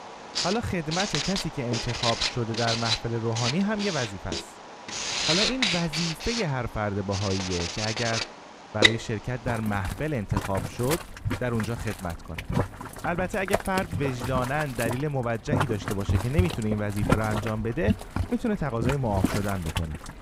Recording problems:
household noises; very loud; throughout; as loud as the speech

